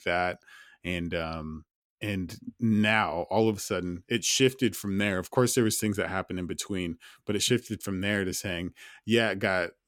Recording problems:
none

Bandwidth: 17 kHz